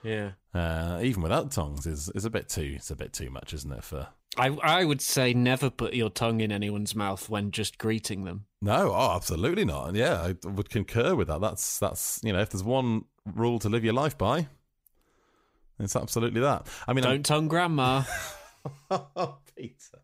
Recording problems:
none

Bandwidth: 15.5 kHz